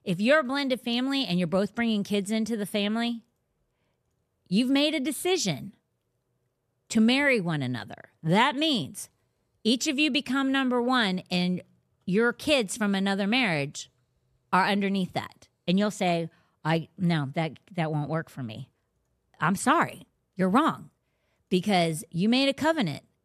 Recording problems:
none

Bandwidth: 14 kHz